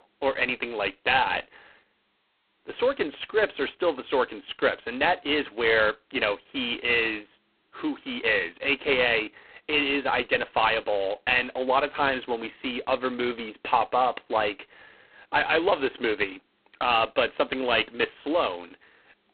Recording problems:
phone-call audio; poor line; nothing above 4 kHz

